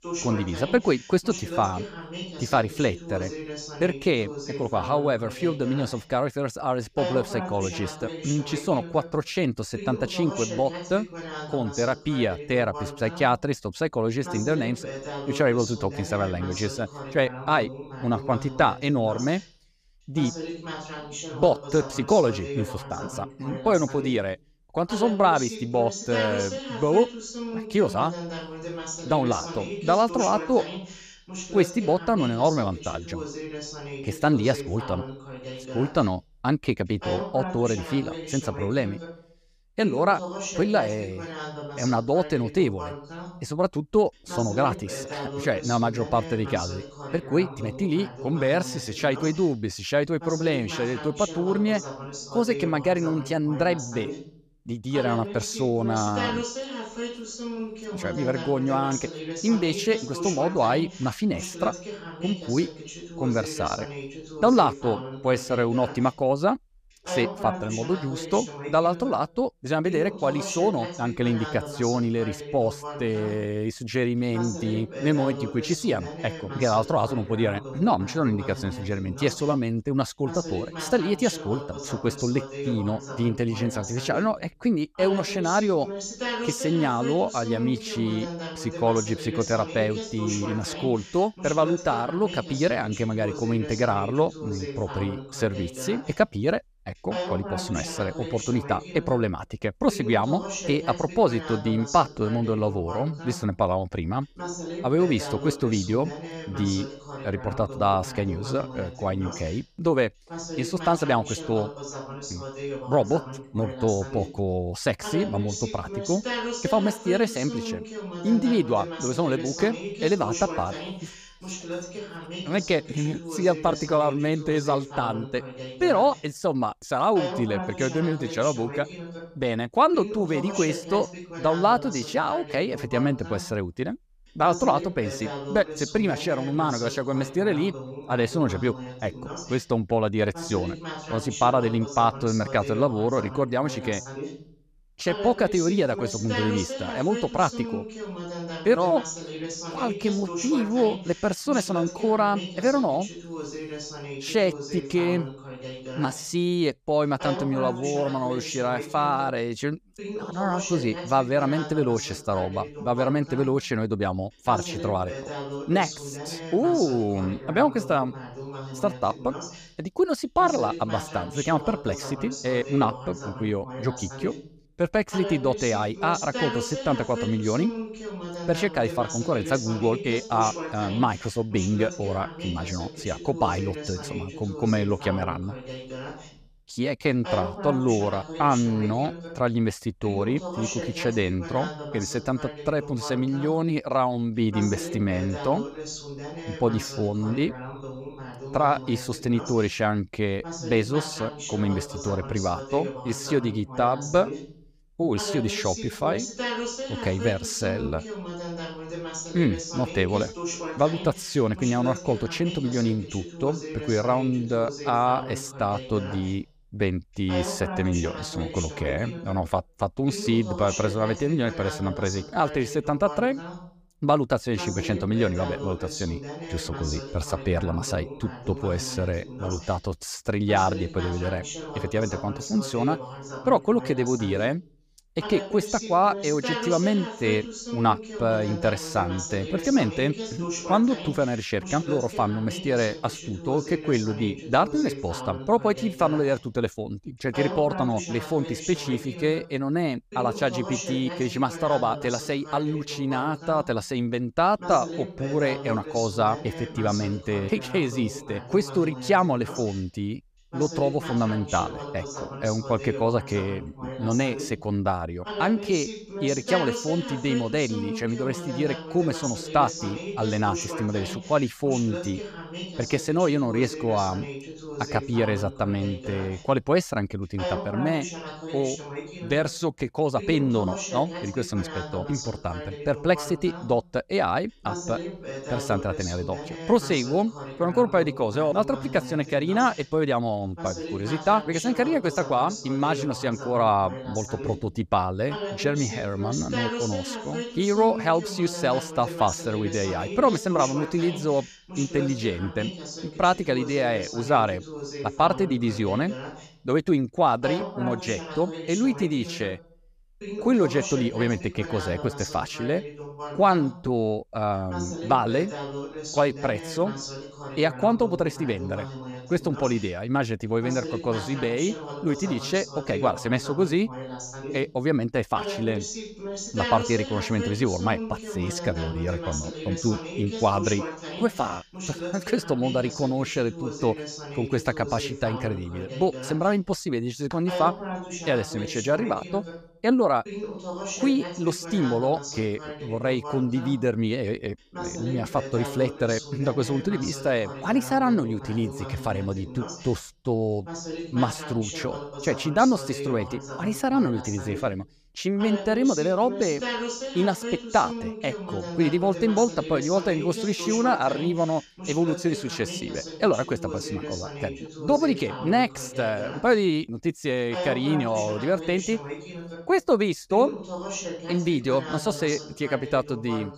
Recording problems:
voice in the background; loud; throughout; 9 dB below the speech

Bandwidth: 15 kHz